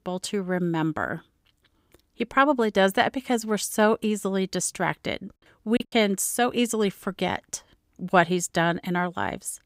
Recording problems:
choppy; very; at 6 s; 14% of the speech affected

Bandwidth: 15.5 kHz